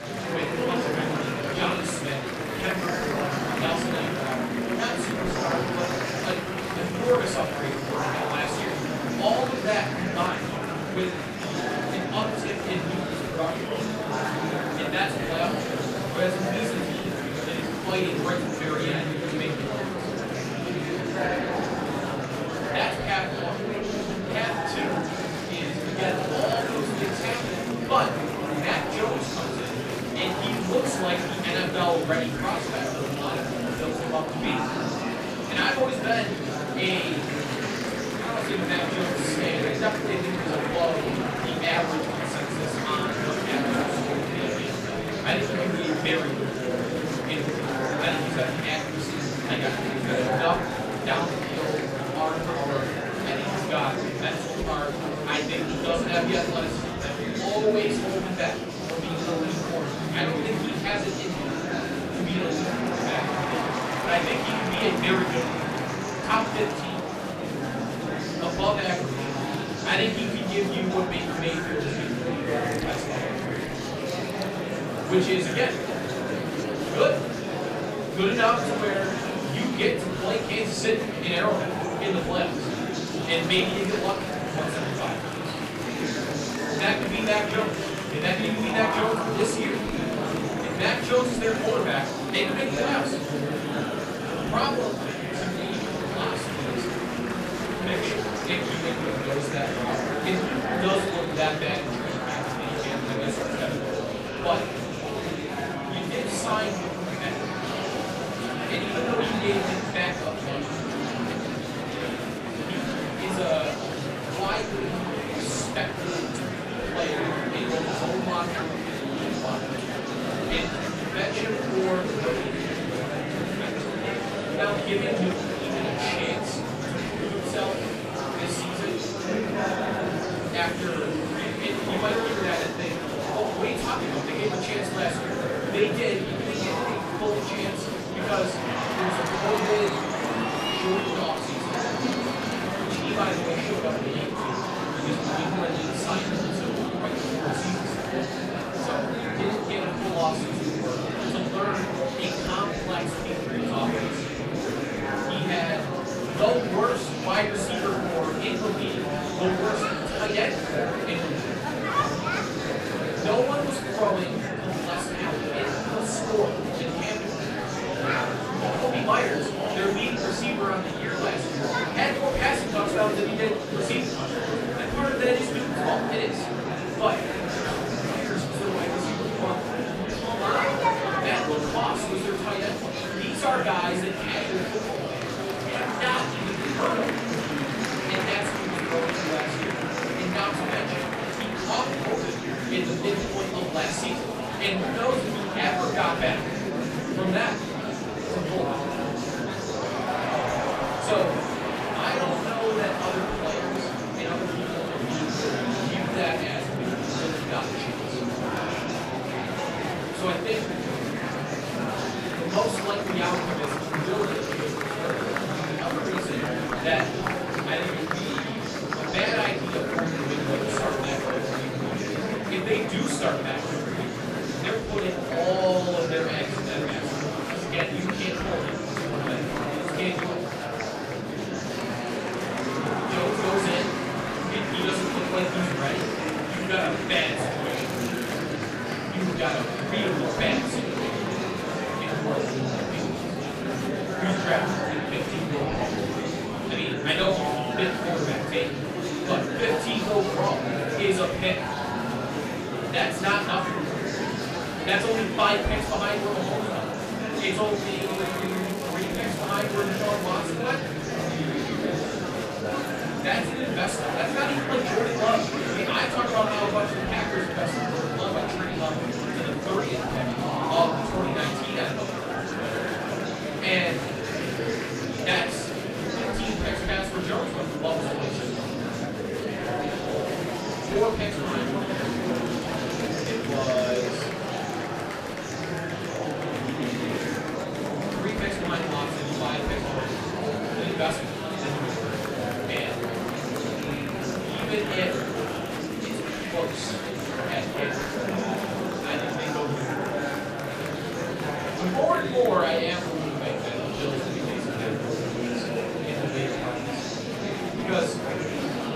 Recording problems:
off-mic speech; far
room echo; slight; dies away in 0.5 s
murmuring crowd; very loud; throughout; as loud as the speech
crackling; noticeable; at 3:58 and from 4:18 to 4:20; 15 dB below the speech
household noises; faint; throughout; 20 dB below the speech

